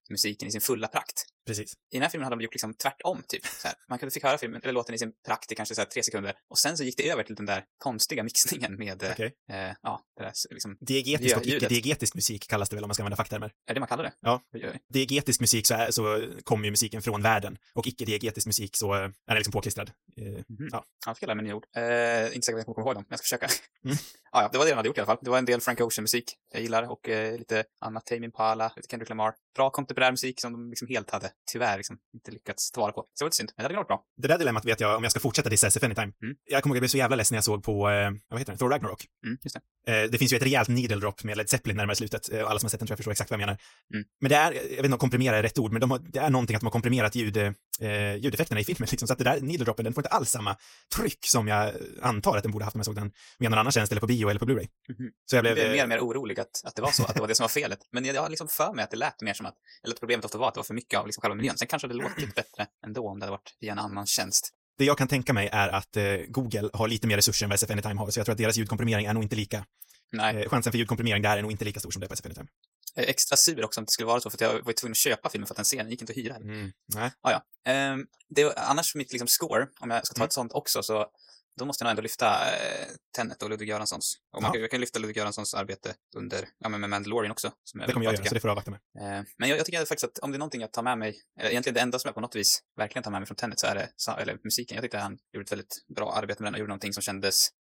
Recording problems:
wrong speed, natural pitch; too fast; 1.6 times normal speed

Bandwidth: 16.5 kHz